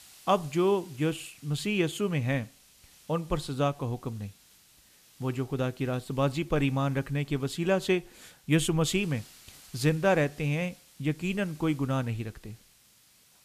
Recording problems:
hiss; faint; throughout; 25 dB below the speech

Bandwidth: 14.5 kHz